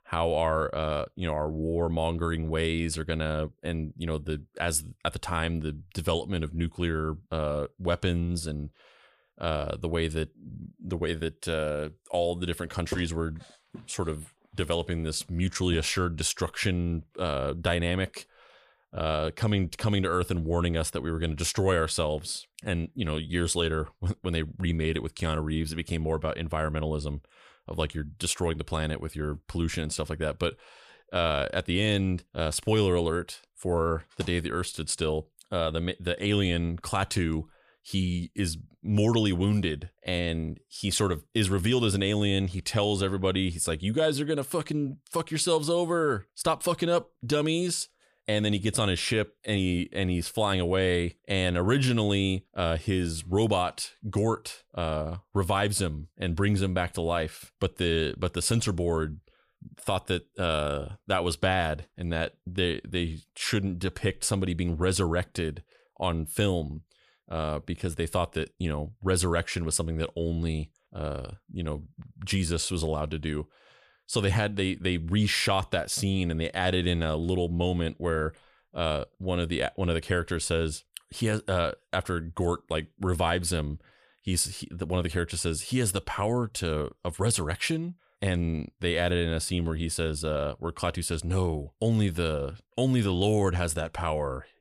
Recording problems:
none

